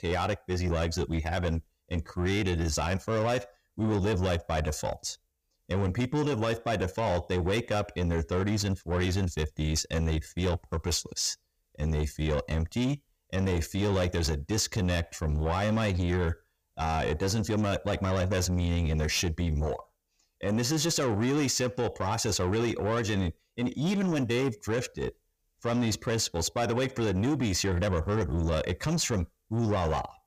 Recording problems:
distortion; slight; 10 dB below the speech

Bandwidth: 15 kHz